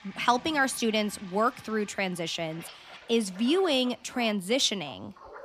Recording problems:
household noises; faint; throughout; 20 dB below the speech

